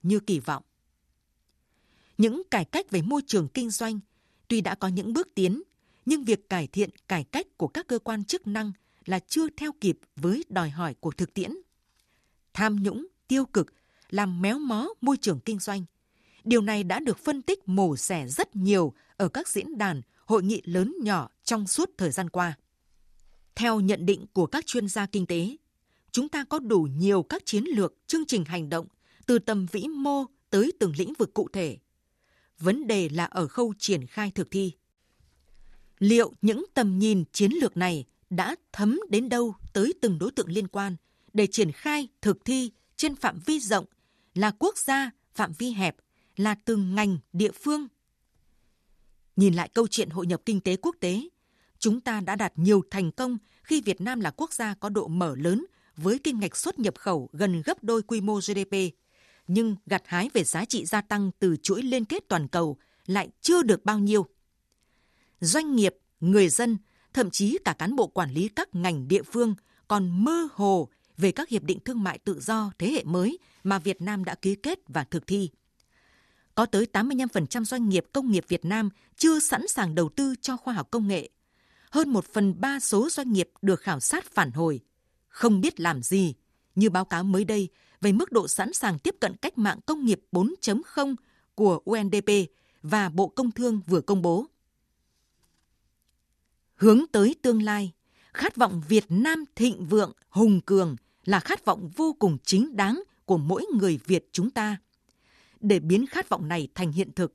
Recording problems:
none

